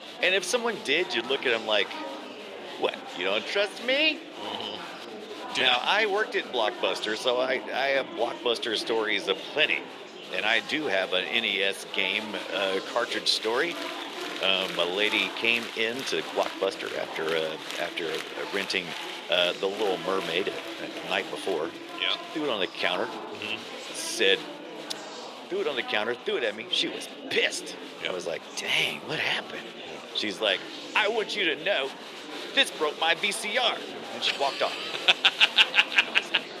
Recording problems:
thin; somewhat; fading below 450 Hz
murmuring crowd; noticeable; throughout; 10 dB below the speech

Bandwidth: 13.5 kHz